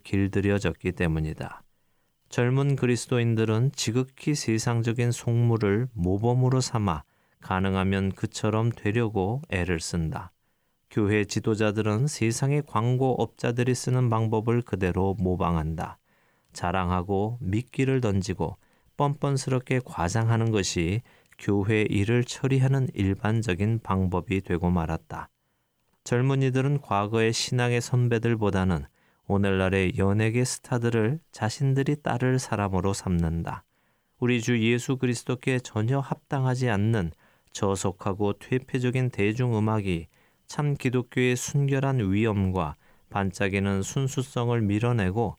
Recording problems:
none

